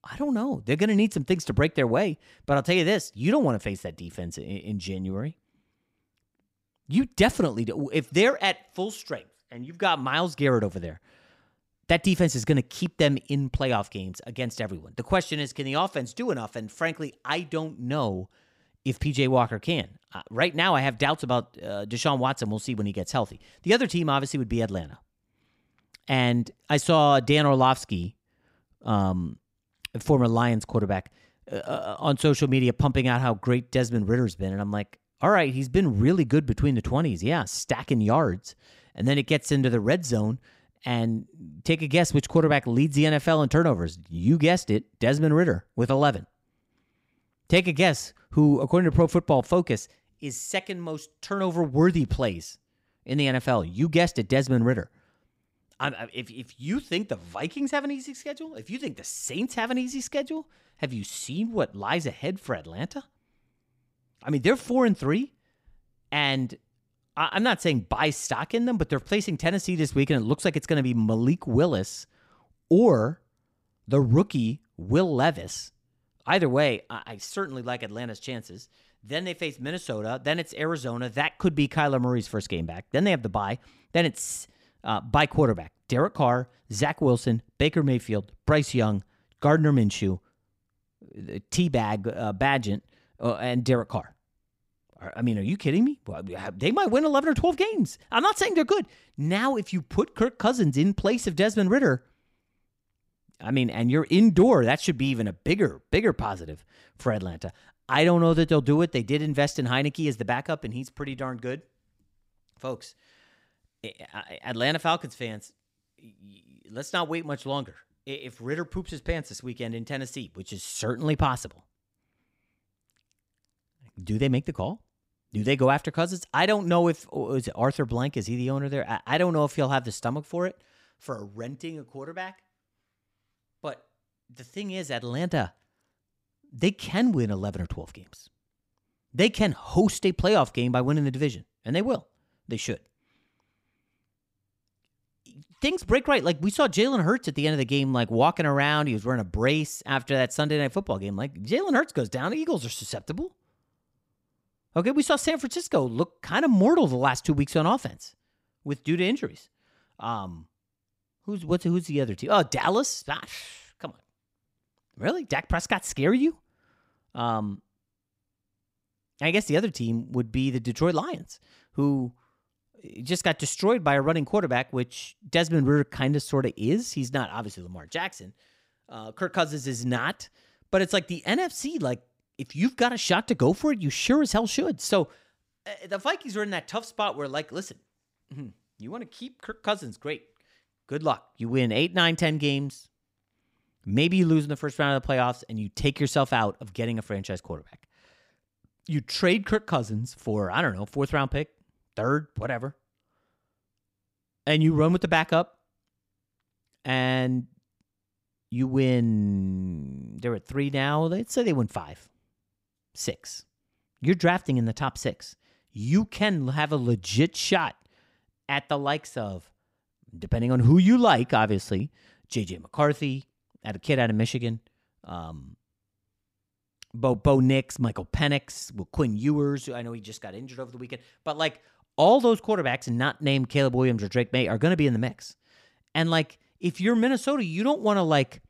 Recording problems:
none

